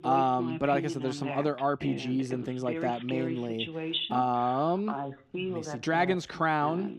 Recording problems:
voice in the background; loud; throughout; 7 dB below the speech

